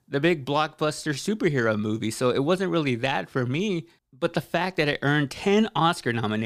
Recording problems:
abrupt cut into speech; at the end

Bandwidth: 15 kHz